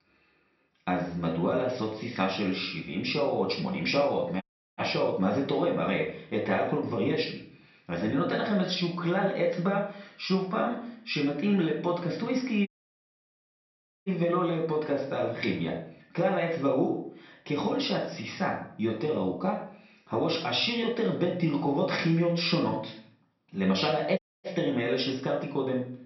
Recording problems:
off-mic speech; far
room echo; noticeable; dies away in 0.5 s
high frequencies cut off; noticeable; nothing above 5.5 kHz
audio cutting out; at 4.5 s, at 13 s for 1.5 s and at 24 s

